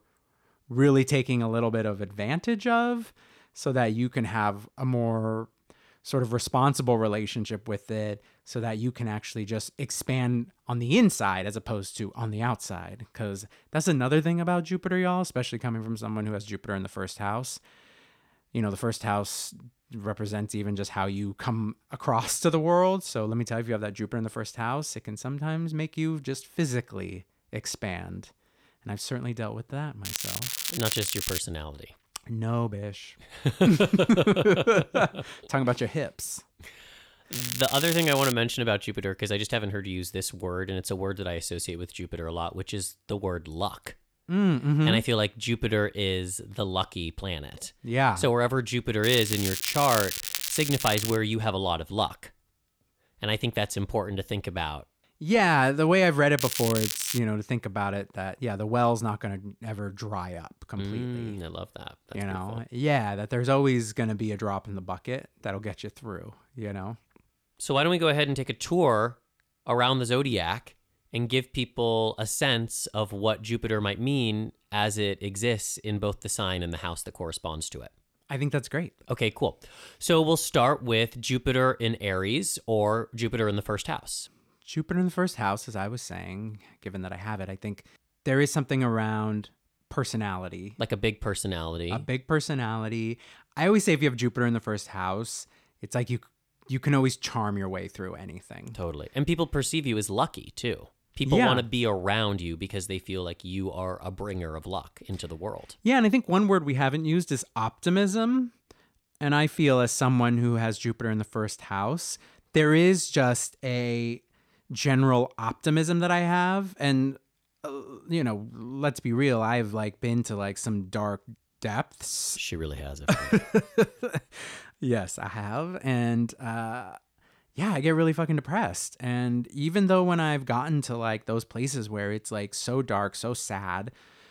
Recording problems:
crackling; loud; 4 times, first at 30 s; 3 dB below the speech

